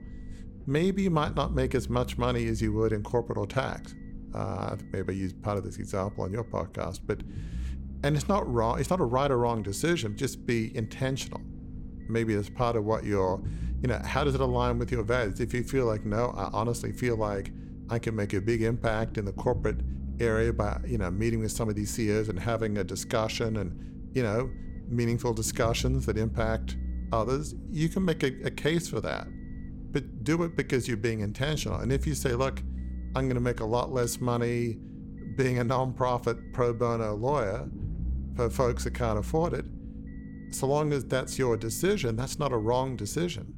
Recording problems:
low rumble; noticeable; throughout; 20 dB below the speech

